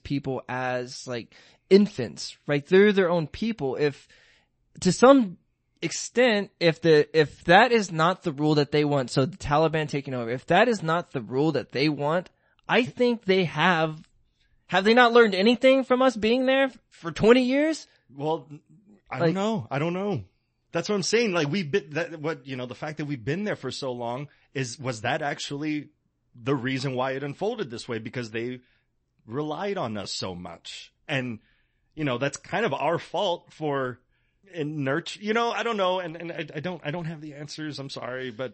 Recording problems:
garbled, watery; slightly; nothing above 8 kHz

